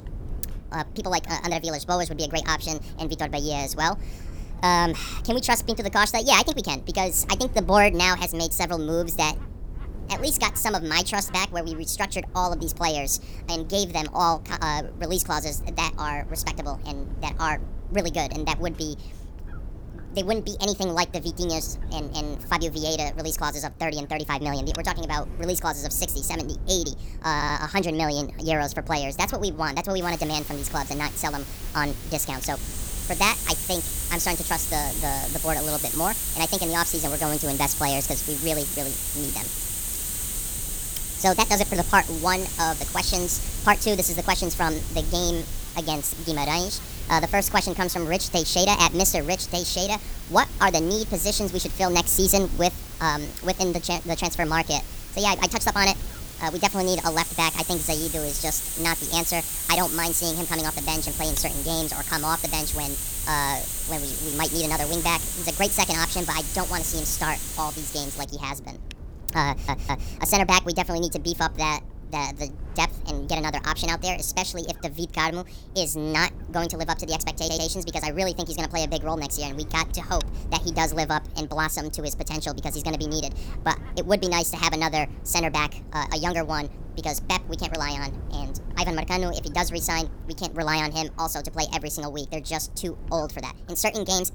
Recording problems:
wrong speed and pitch; too fast and too high; 1.5 times normal speed
hiss; loud; from 30 s to 1:08; 4 dB below the speech
wind noise on the microphone; occasional gusts; 25 dB below the speech
audio stuttering; at 27 s, at 1:09 and at 1:17

